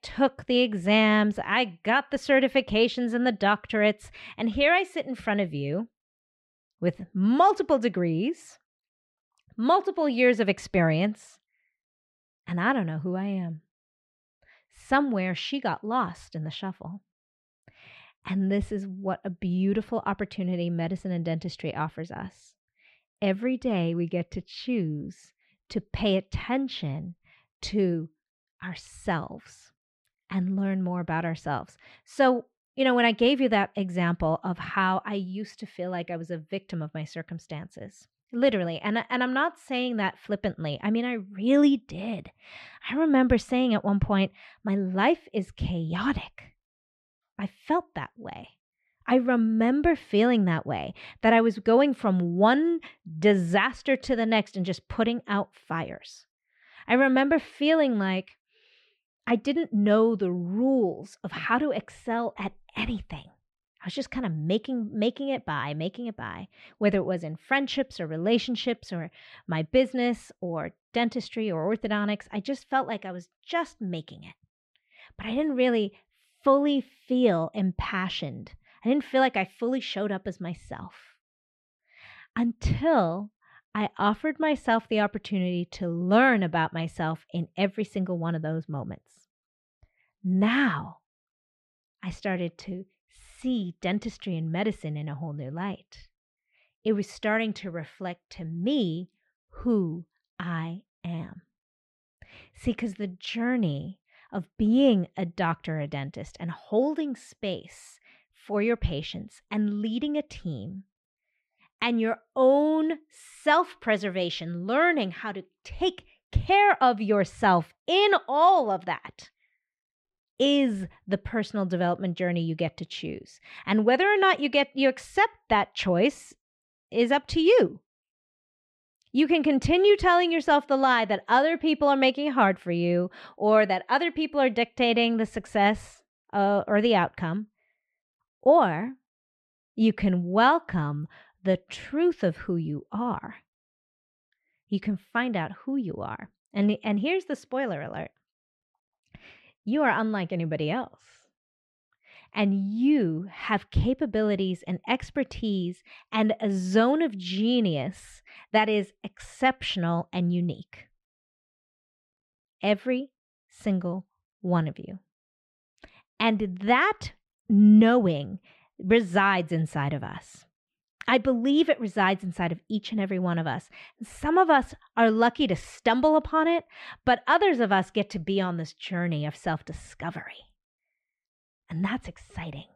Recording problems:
muffled; slightly; fading above 3 kHz

